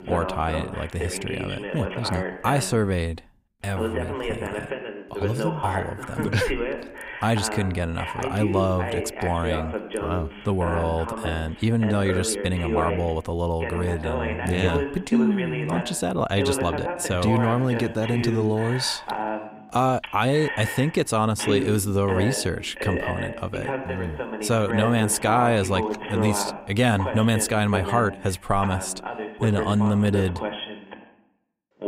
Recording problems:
voice in the background; loud; throughout; 6 dB below the speech

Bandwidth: 15.5 kHz